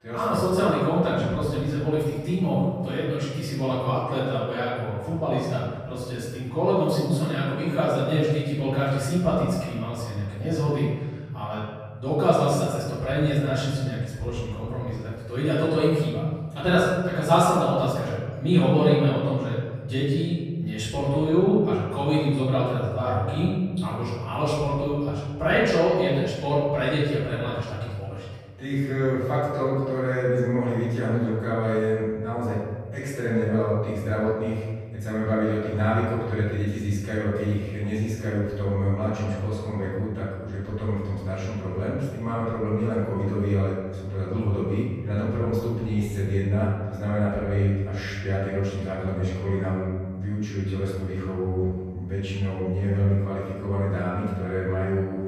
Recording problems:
room echo; strong; dies away in 1.6 s
off-mic speech; far

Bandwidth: 14.5 kHz